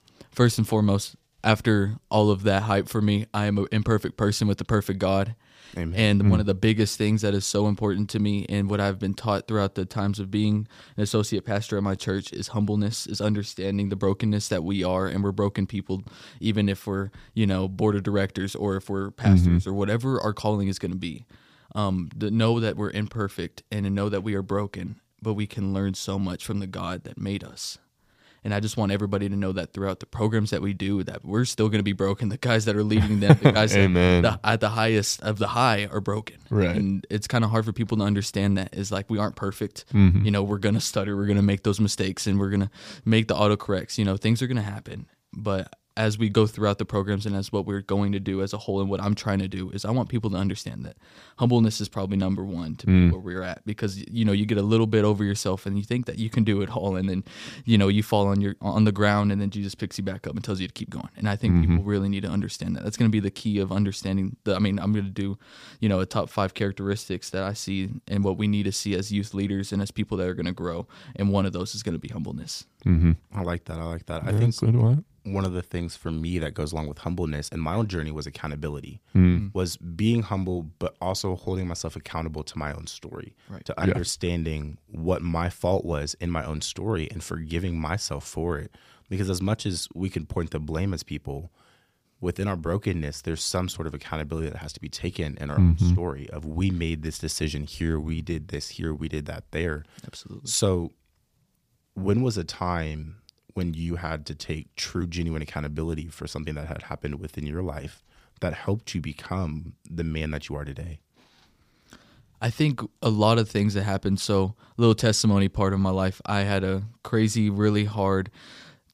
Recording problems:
none

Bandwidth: 15 kHz